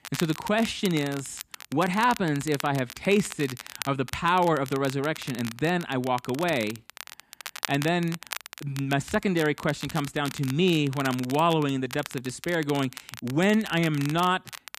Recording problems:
crackle, like an old record; noticeable; 15 dB below the speech

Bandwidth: 14.5 kHz